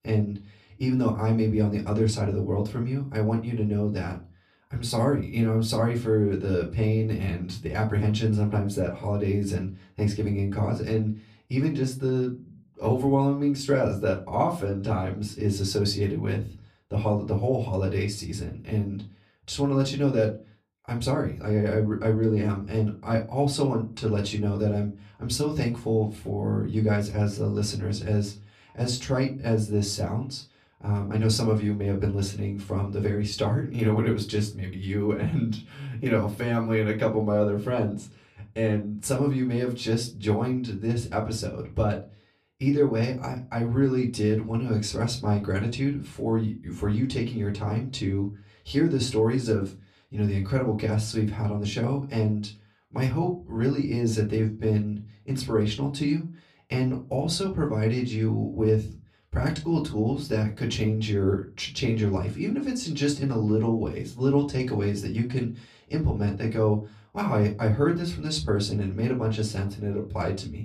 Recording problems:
off-mic speech; far
room echo; very slight; dies away in 0.2 s

